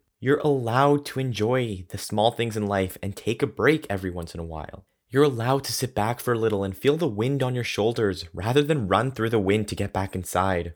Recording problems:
none

